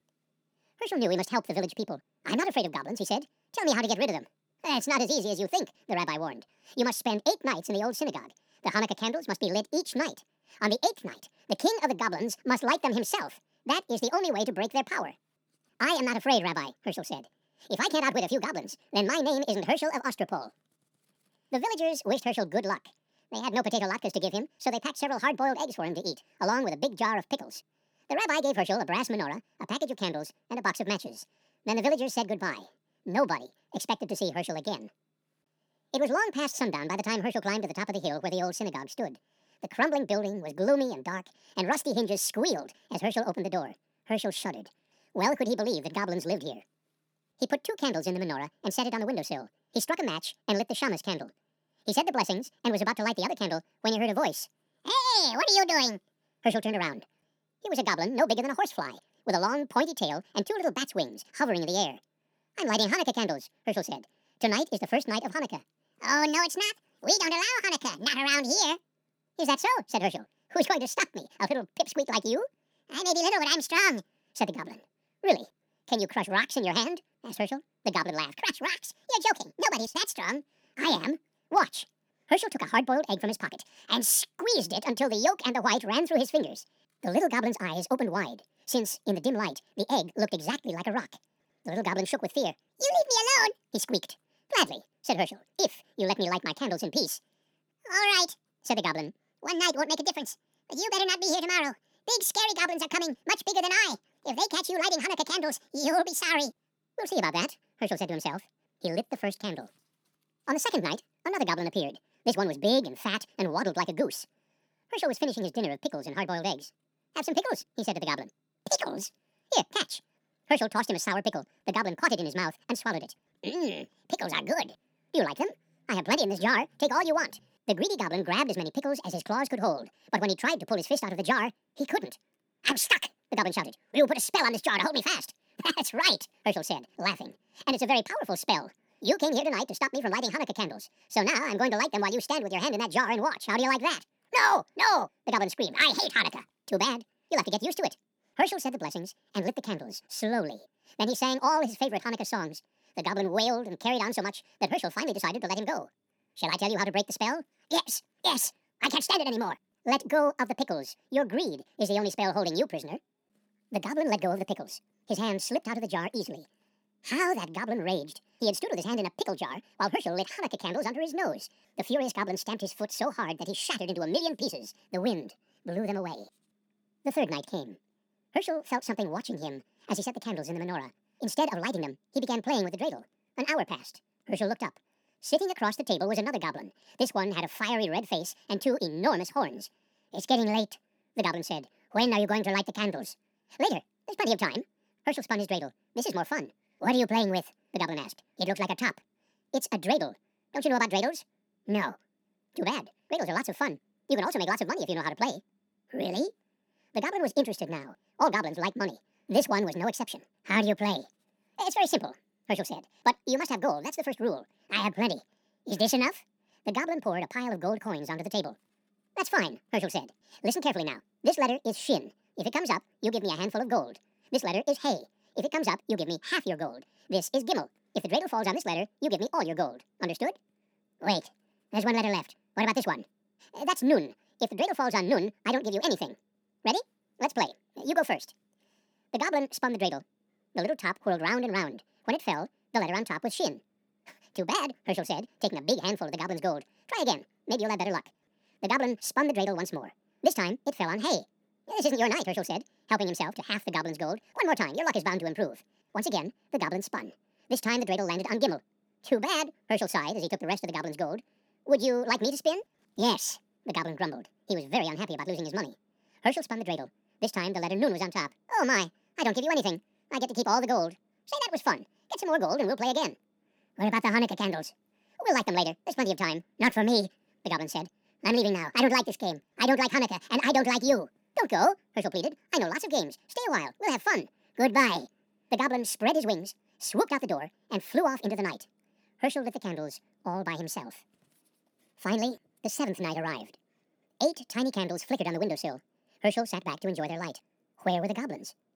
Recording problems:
wrong speed and pitch; too fast and too high; 1.7 times normal speed

